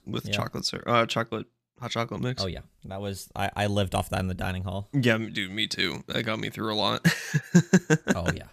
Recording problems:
none

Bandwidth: 14.5 kHz